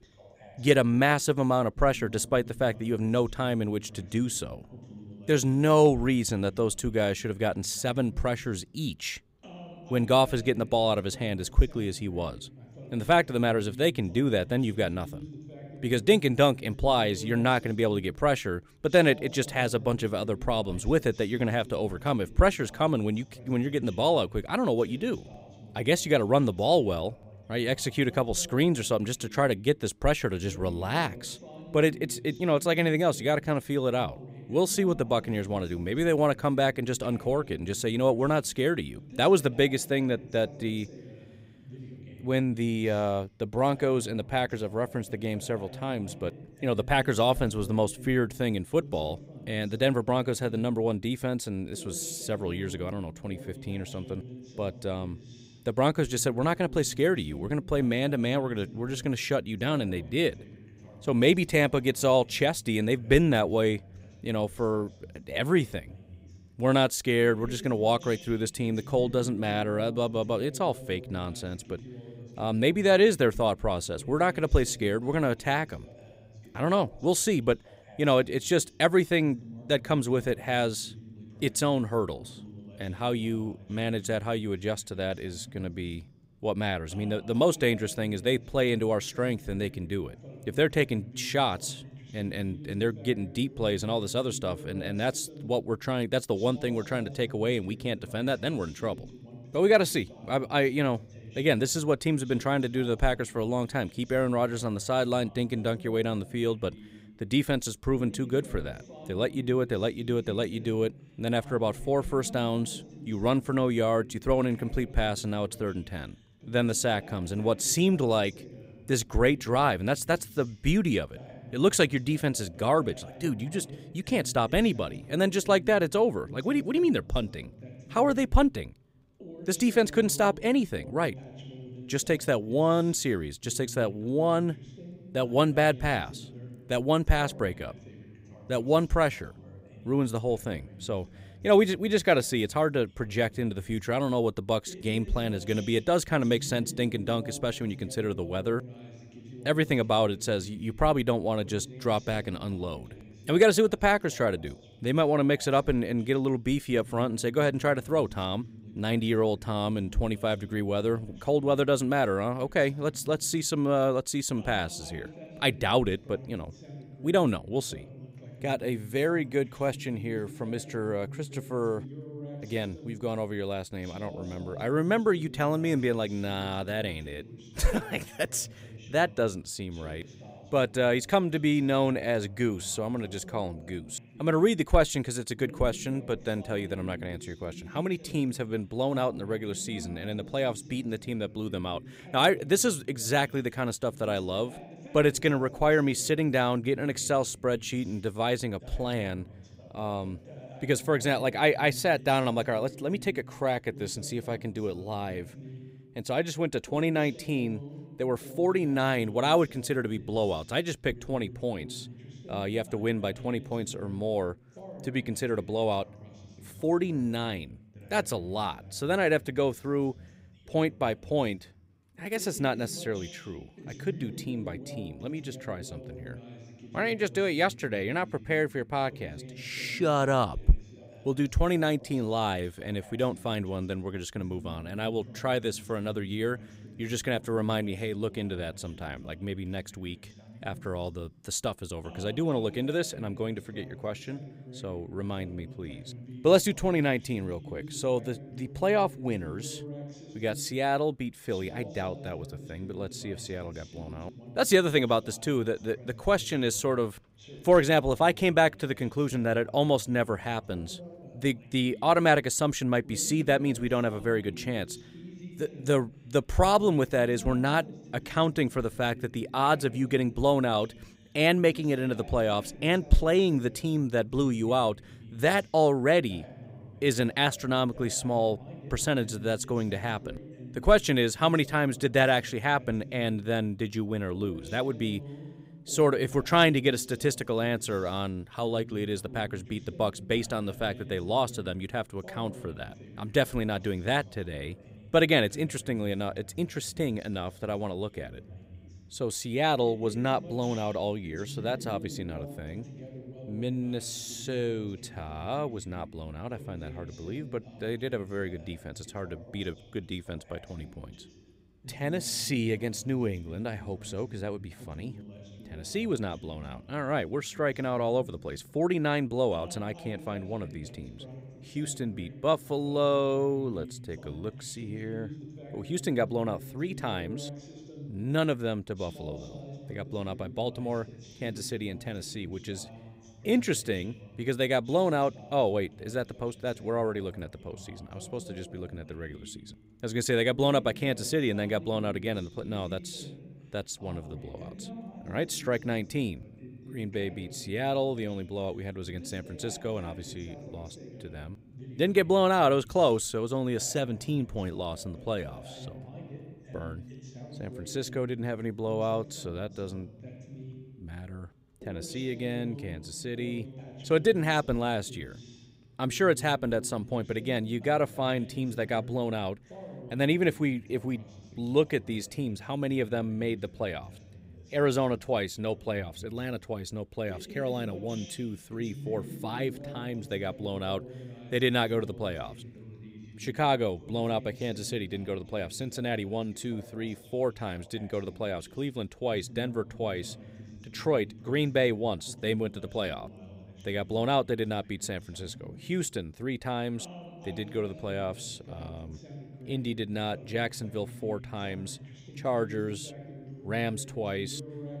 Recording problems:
voice in the background; noticeable; throughout; 20 dB below the speech

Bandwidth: 15.5 kHz